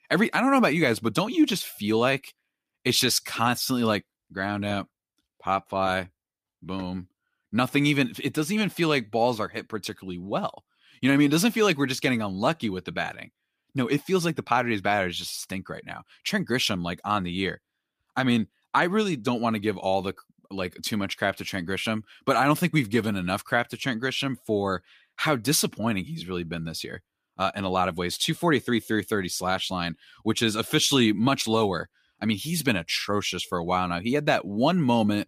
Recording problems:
none

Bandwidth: 15 kHz